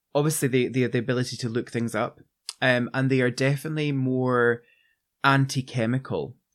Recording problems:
none

